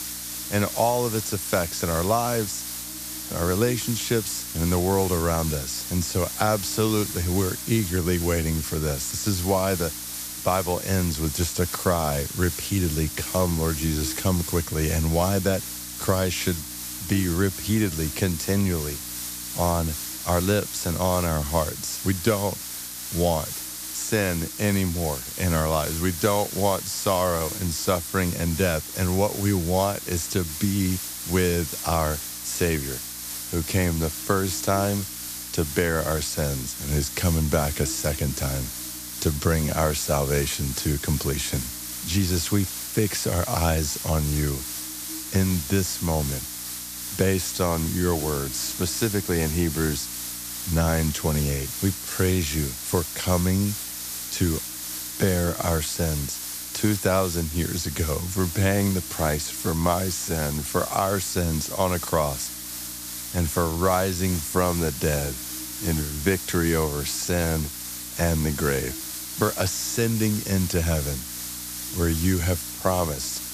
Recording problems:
hiss; loud; throughout; 6 dB below the speech
electrical hum; faint; throughout; 60 Hz, 25 dB below the speech

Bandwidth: 14.5 kHz